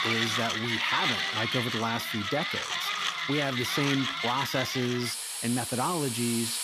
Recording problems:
machinery noise; very loud; throughout; 2 dB above the speech

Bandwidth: 14.5 kHz